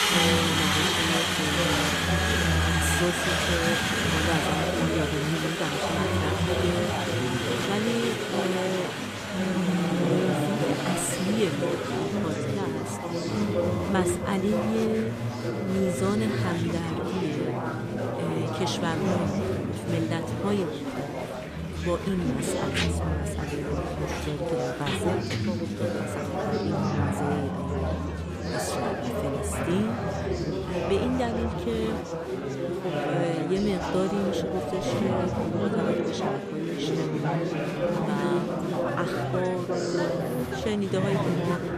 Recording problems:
chatter from many people; very loud; throughout; 3 dB above the speech

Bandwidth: 14.5 kHz